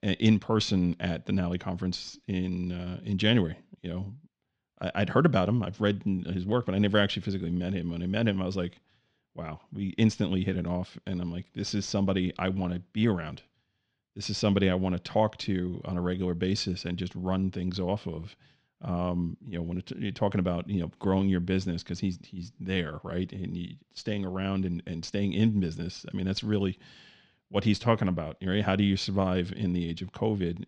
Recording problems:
muffled; slightly; fading above 3.5 kHz

